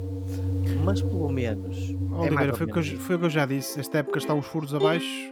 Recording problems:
background music; loud; throughout; 3 dB below the speech

